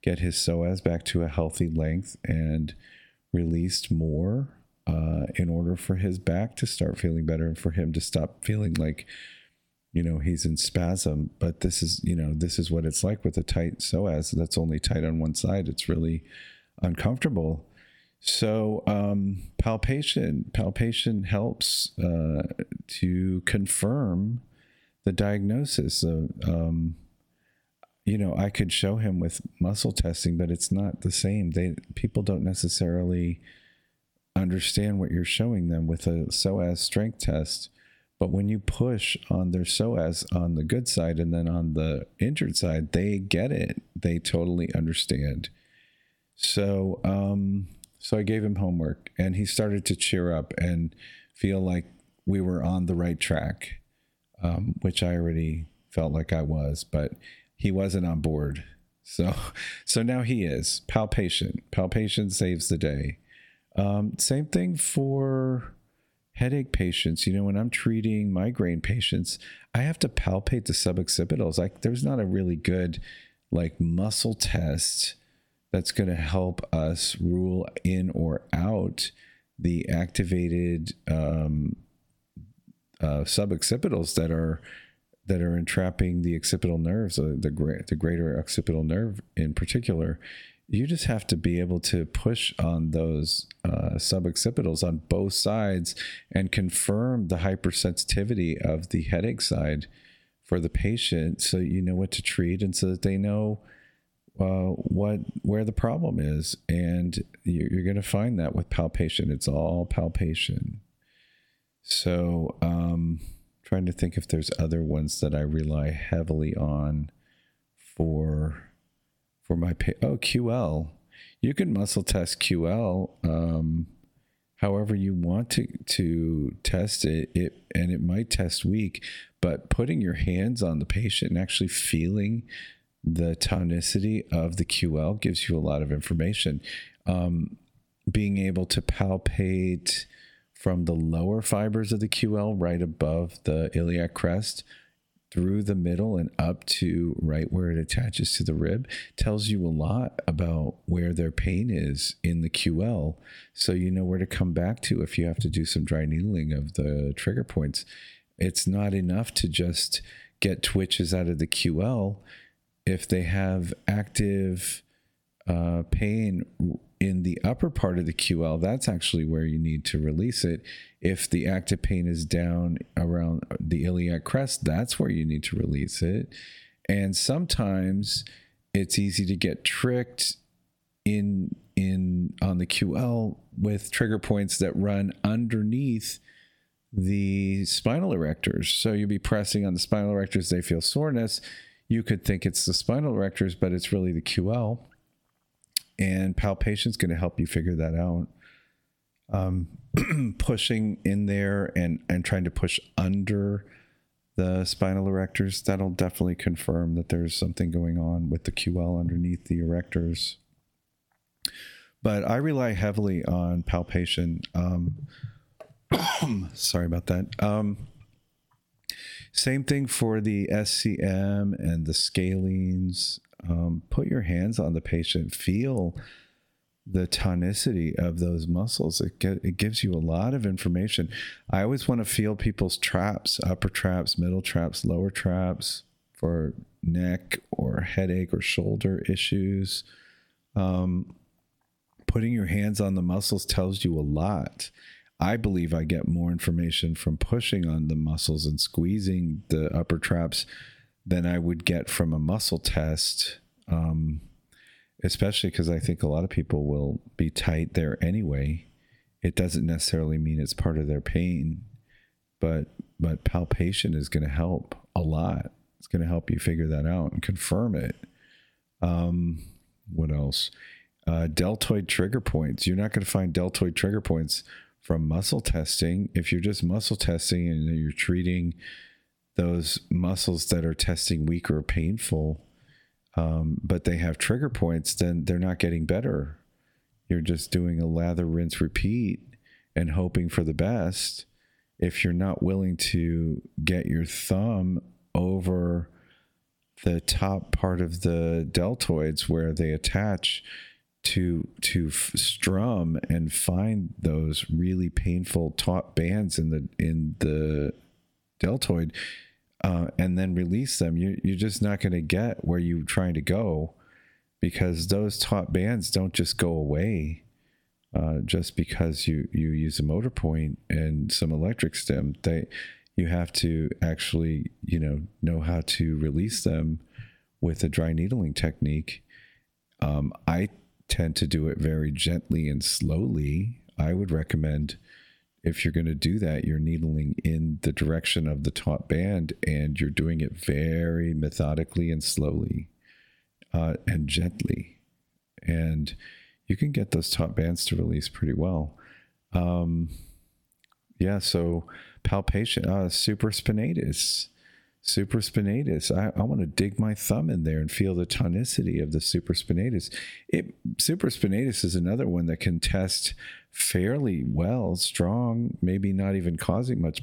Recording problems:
squashed, flat; heavily

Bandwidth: 17.5 kHz